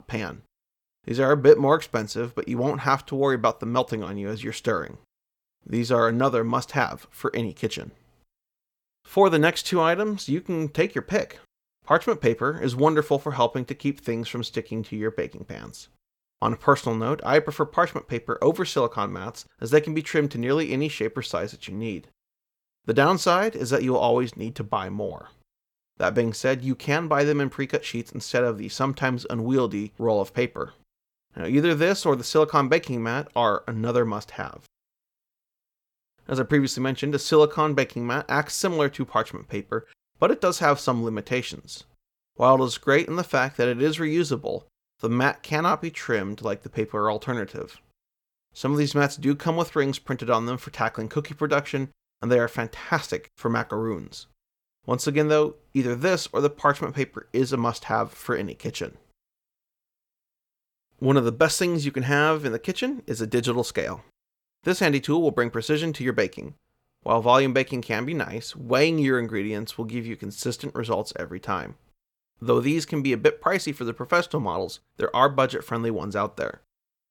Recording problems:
none

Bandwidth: 18.5 kHz